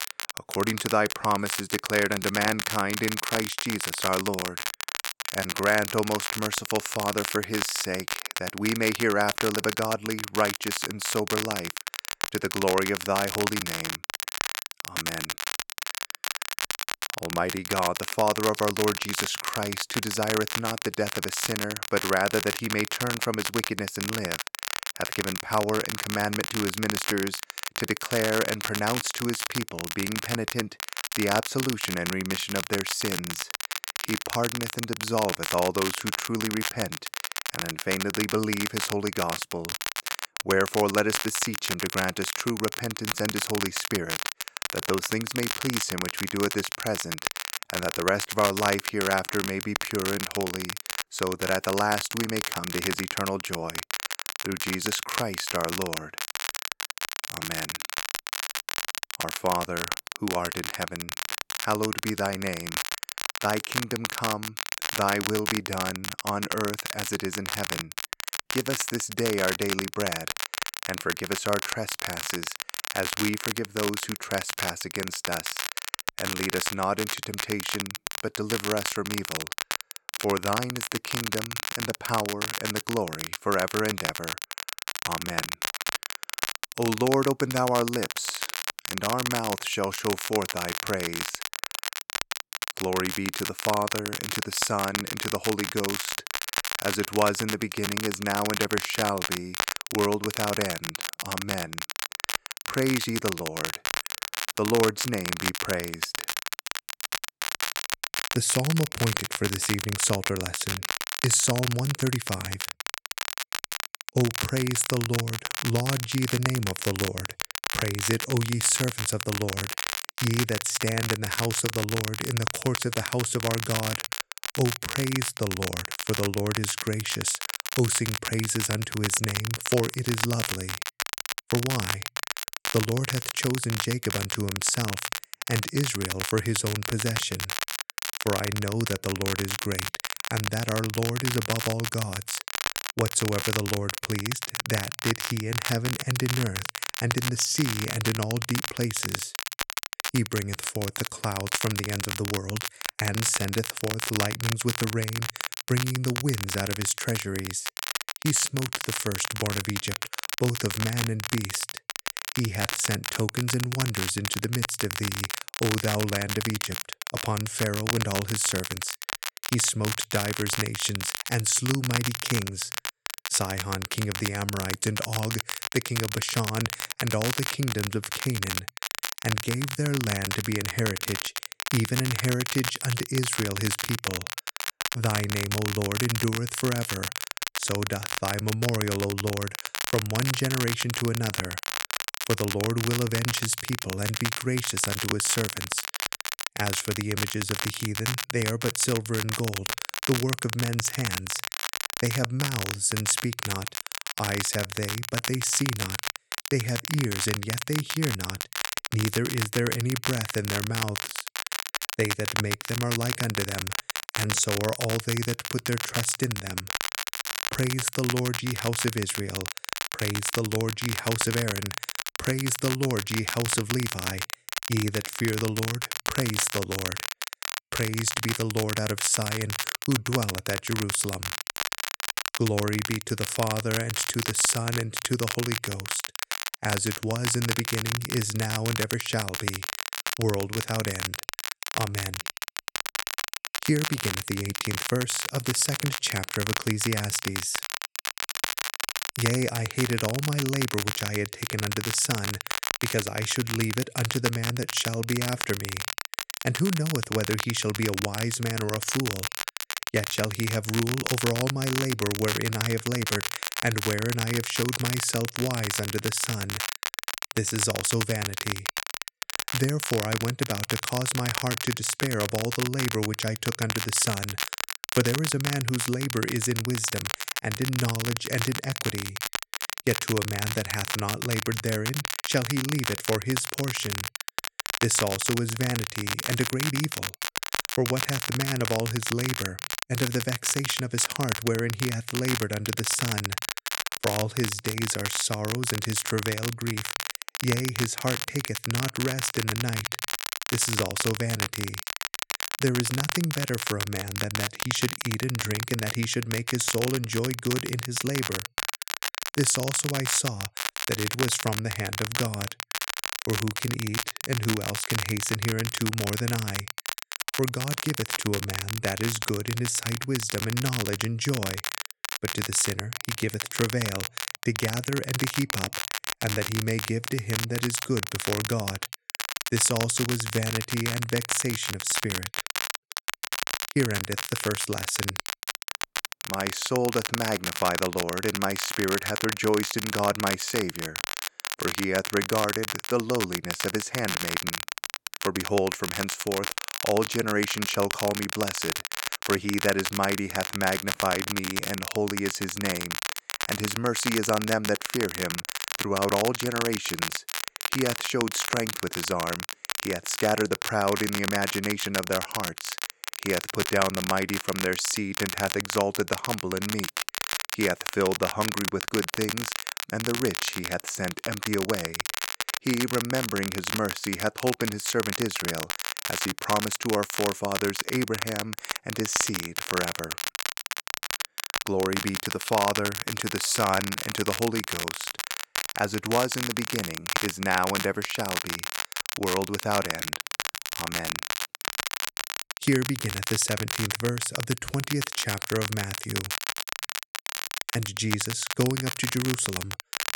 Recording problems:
crackle, like an old record; loud; 2 dB below the speech

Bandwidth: 17 kHz